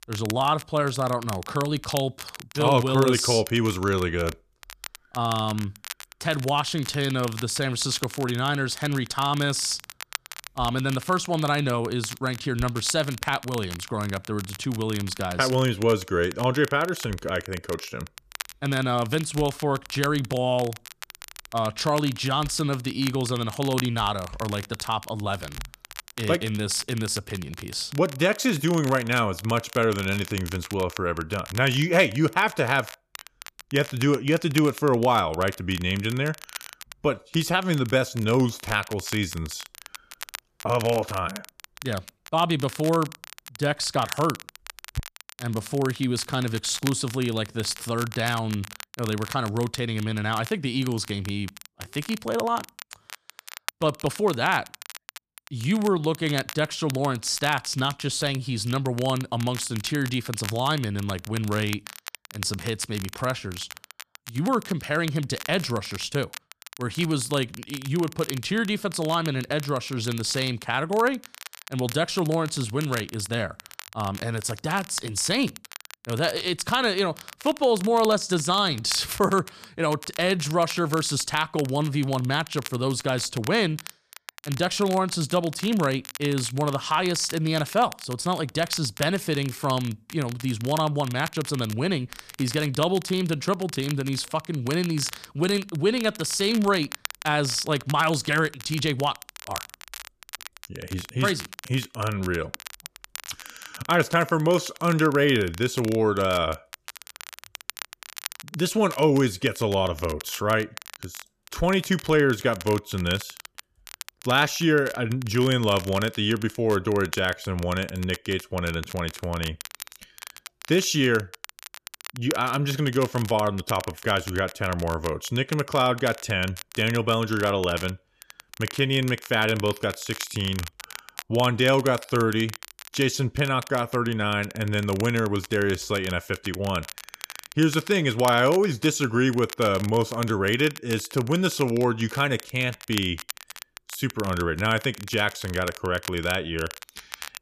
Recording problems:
crackle, like an old record; noticeable; 15 dB below the speech

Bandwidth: 14.5 kHz